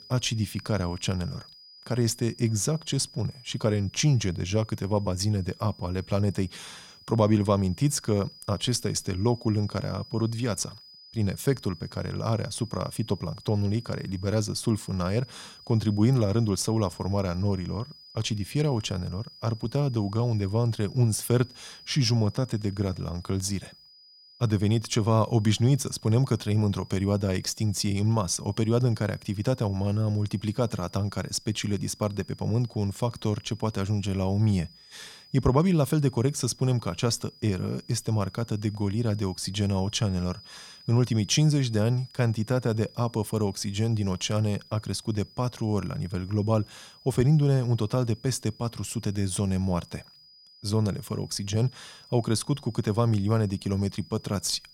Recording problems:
high-pitched whine; faint; throughout; 5 kHz, 20 dB below the speech

